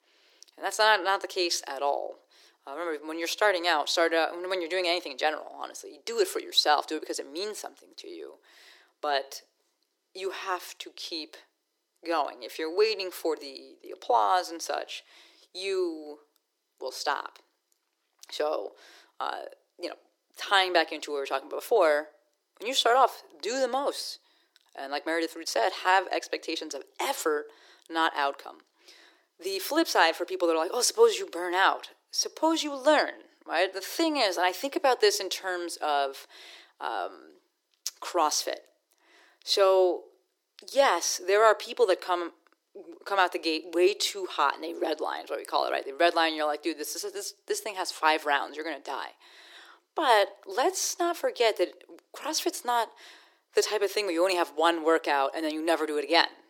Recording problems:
thin; very; fading below 350 Hz

